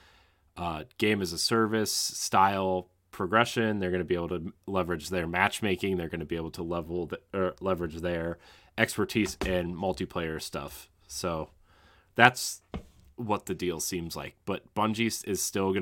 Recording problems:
abrupt cut into speech; at the end

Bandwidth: 16.5 kHz